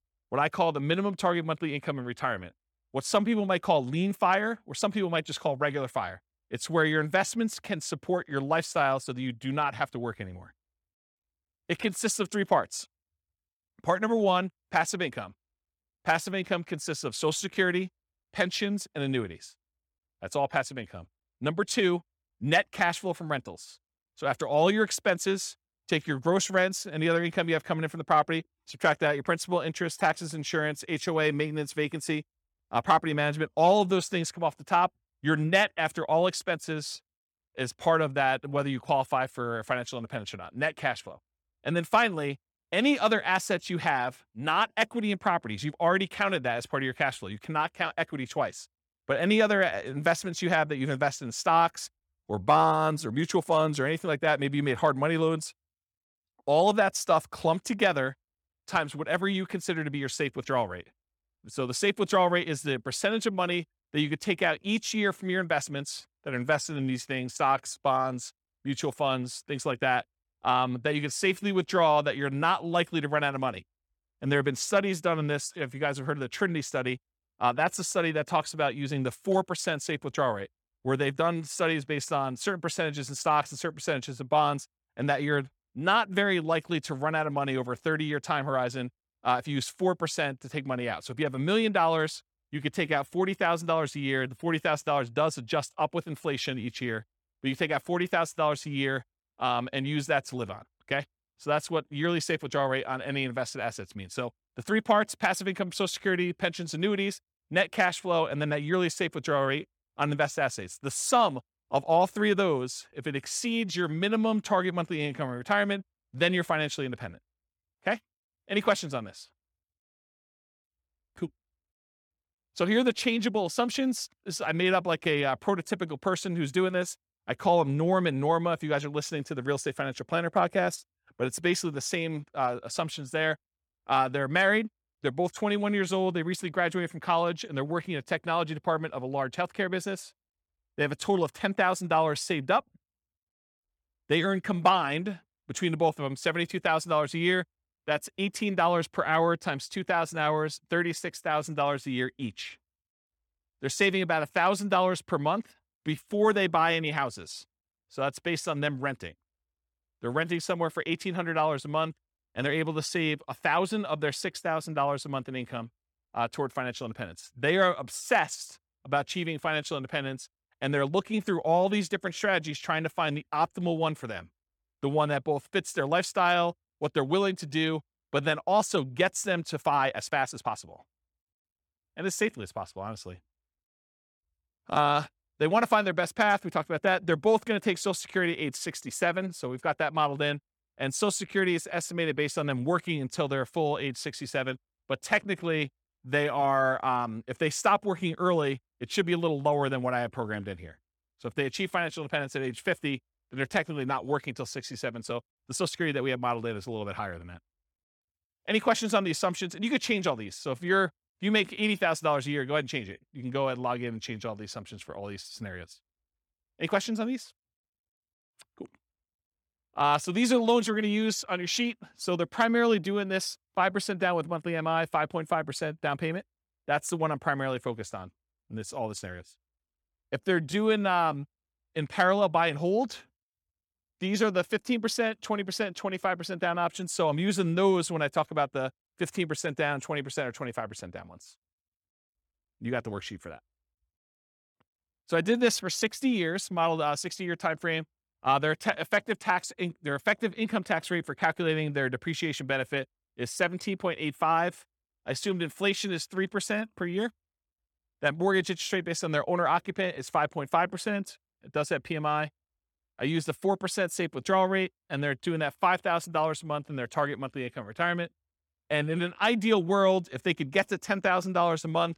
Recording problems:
uneven, jittery; strongly; from 52 s to 3:53

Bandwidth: 18 kHz